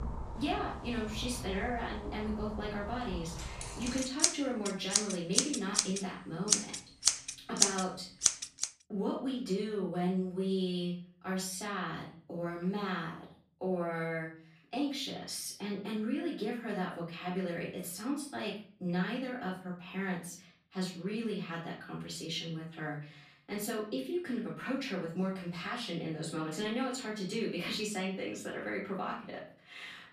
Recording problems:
off-mic speech; far
room echo; slight; dies away in 0.5 s
household noises; very loud; until 8.5 s; 5 dB above the speech

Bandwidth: 14.5 kHz